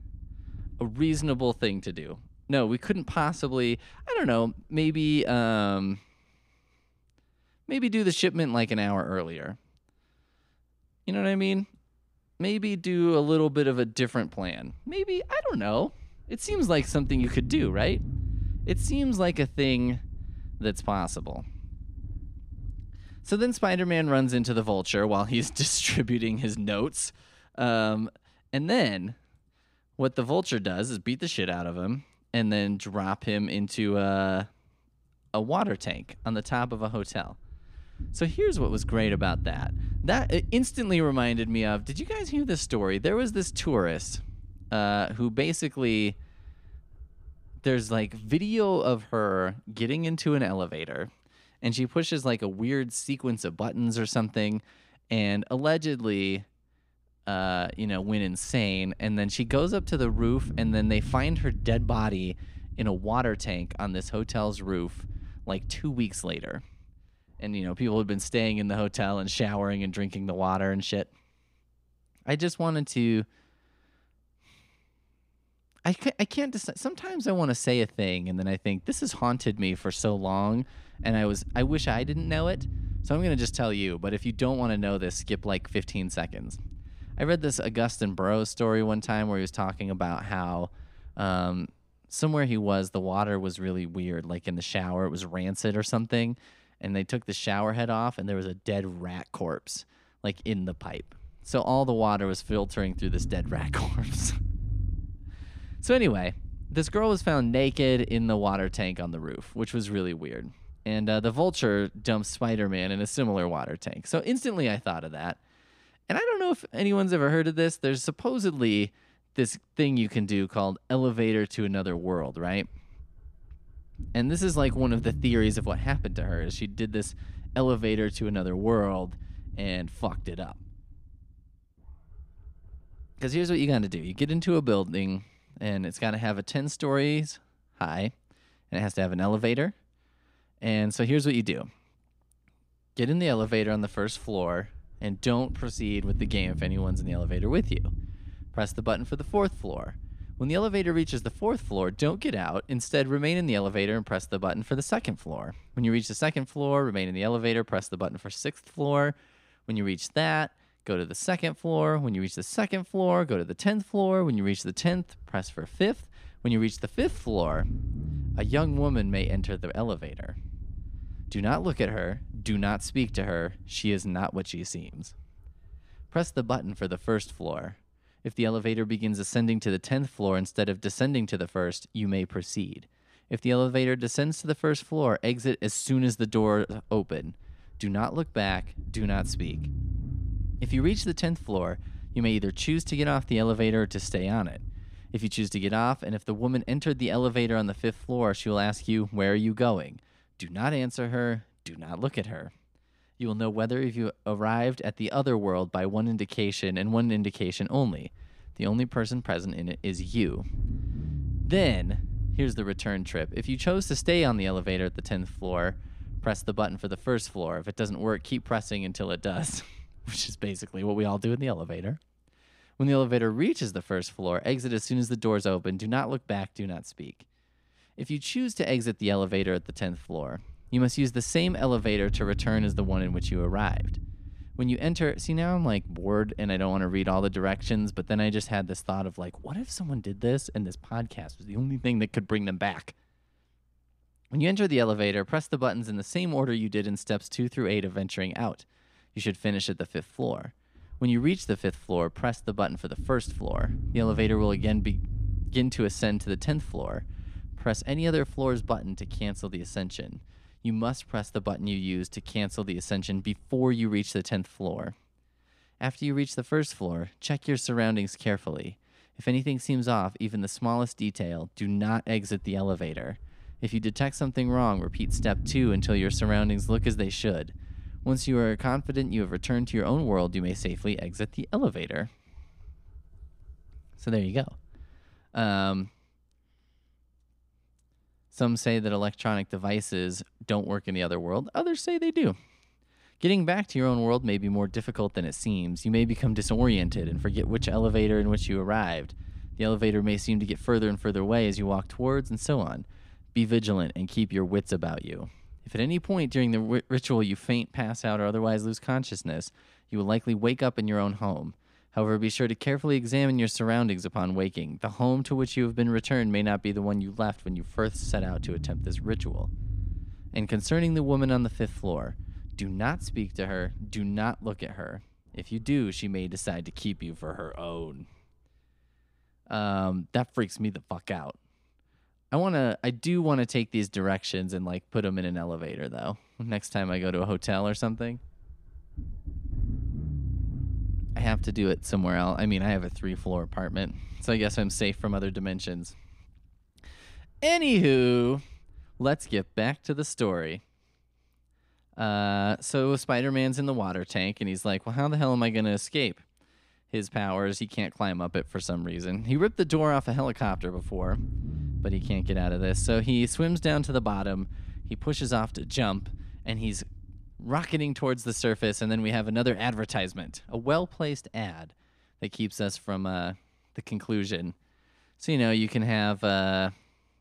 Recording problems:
low rumble; faint; throughout; 20 dB below the speech

